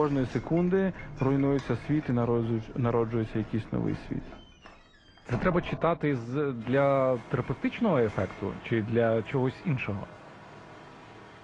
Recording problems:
muffled; very; fading above 2 kHz
garbled, watery; slightly; nothing above 10 kHz
household noises; noticeable; throughout; 15 dB below the speech
abrupt cut into speech; at the start

